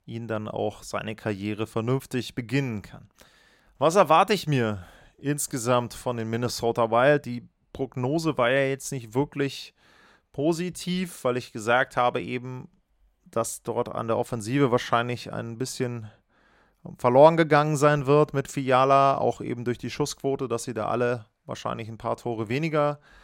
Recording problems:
none

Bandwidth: 16.5 kHz